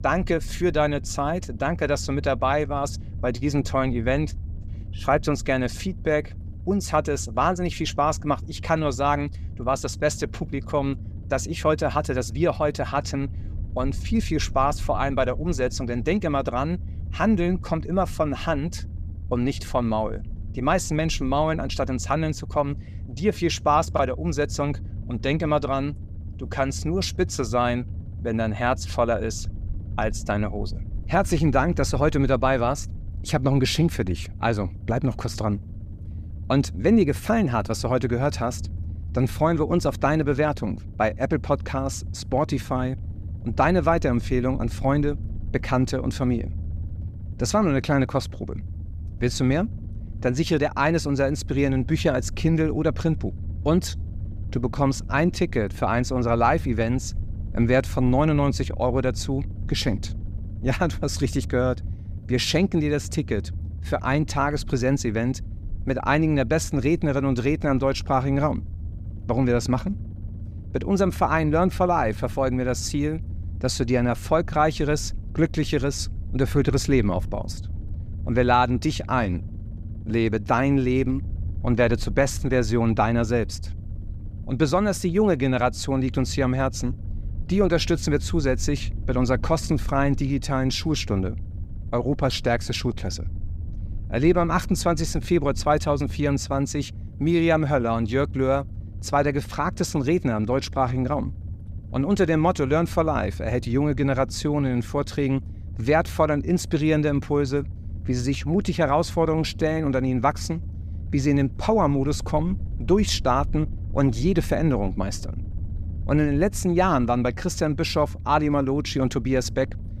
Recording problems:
low rumble; faint; throughout; 25 dB below the speech

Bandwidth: 14.5 kHz